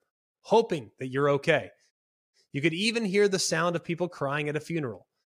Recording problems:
none

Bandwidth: 15.5 kHz